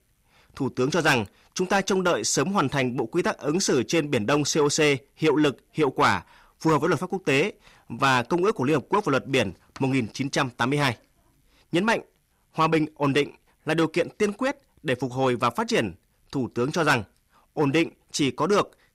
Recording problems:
distortion; slight; 10 dB below the speech

